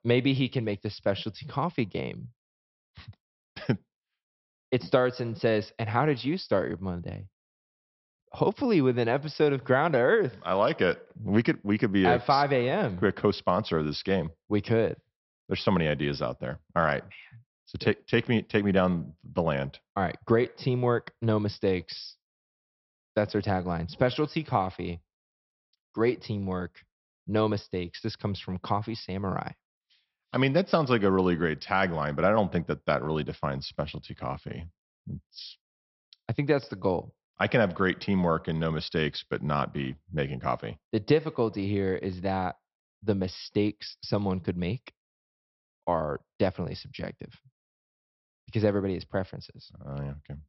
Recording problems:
high frequencies cut off; noticeable; nothing above 5.5 kHz

